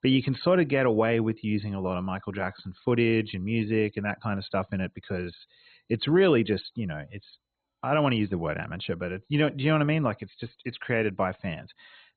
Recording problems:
garbled, watery; badly; nothing above 4 kHz

